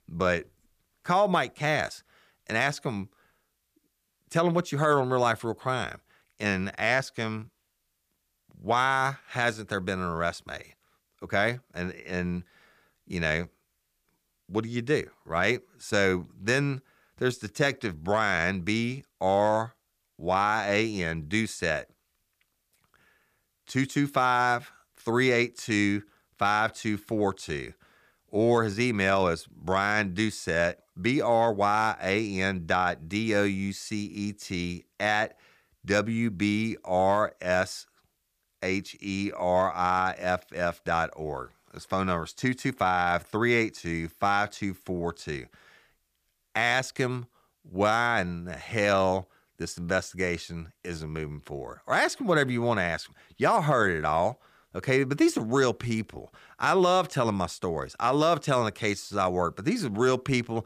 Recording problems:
none

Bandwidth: 15 kHz